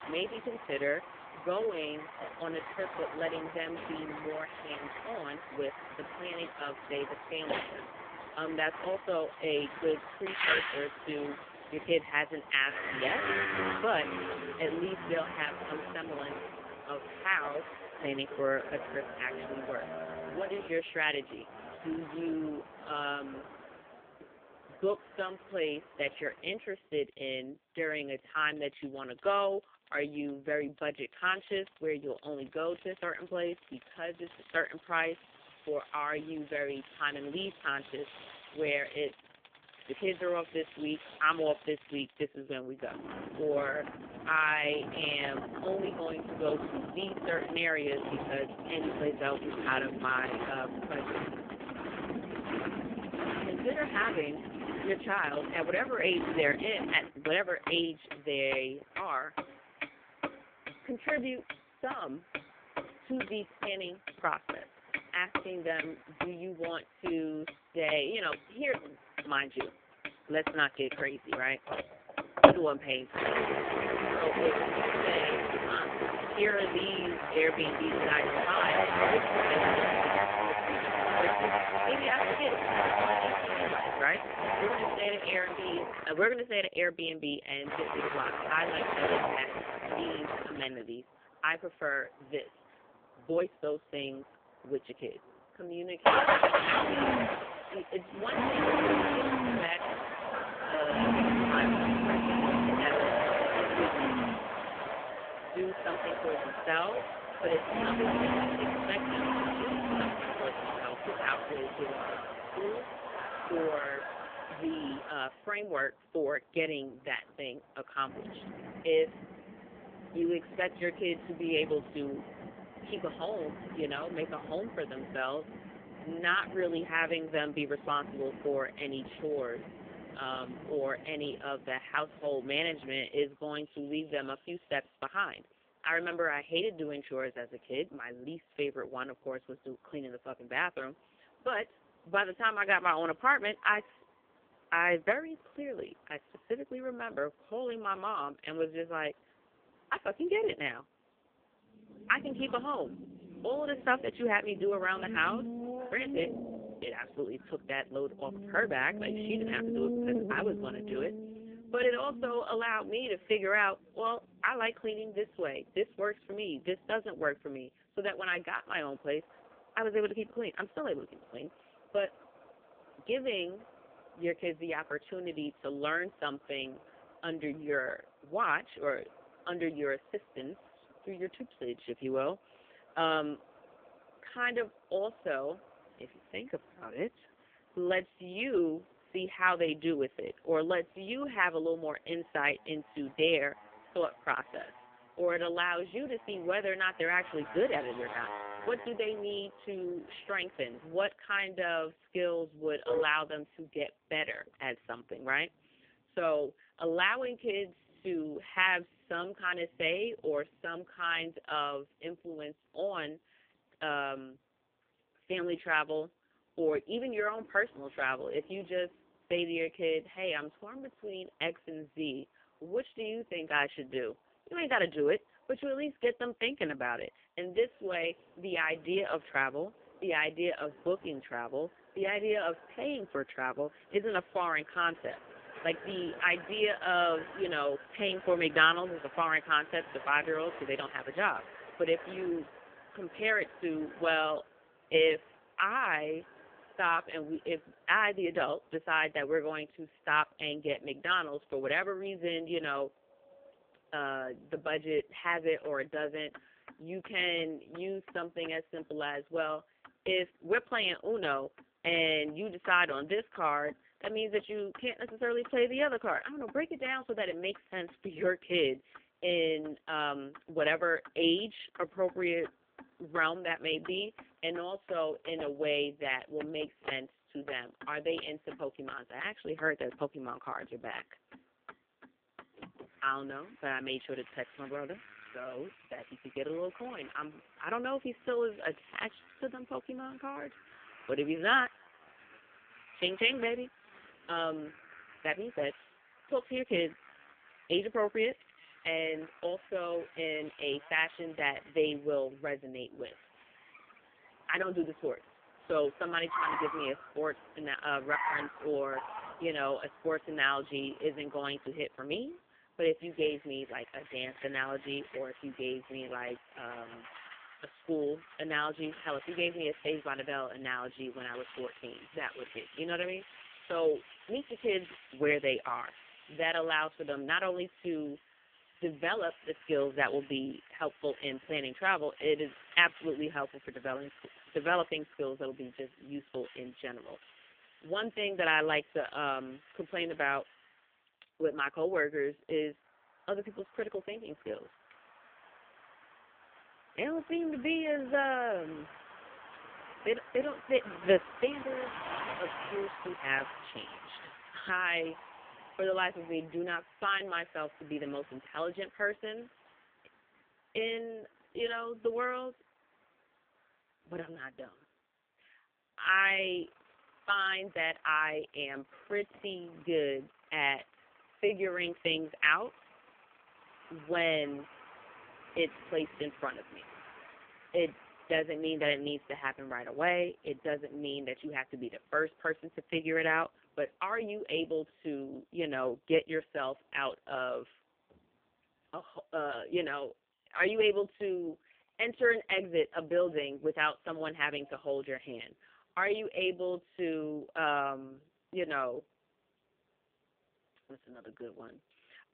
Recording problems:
phone-call audio; poor line; nothing above 3.5 kHz
traffic noise; loud; throughout; 2 dB below the speech

